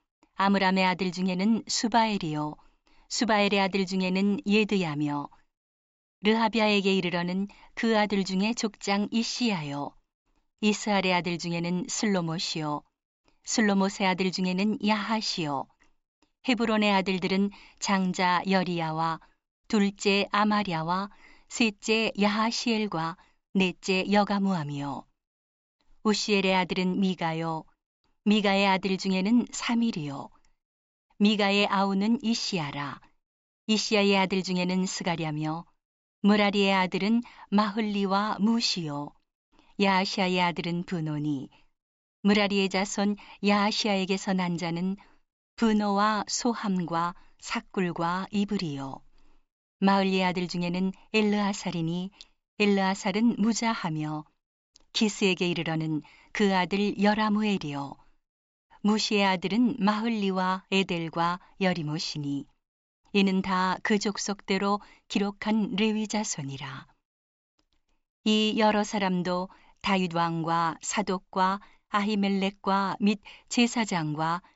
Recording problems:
high frequencies cut off; noticeable; nothing above 8 kHz

